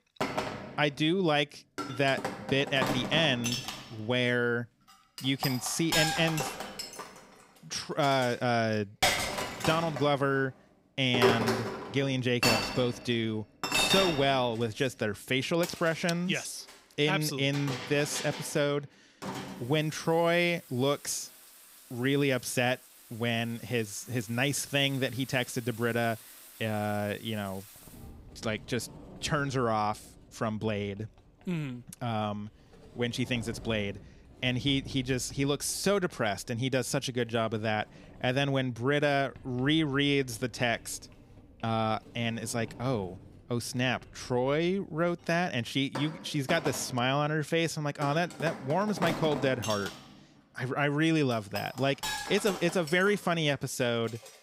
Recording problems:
household noises; loud; throughout; 5 dB below the speech

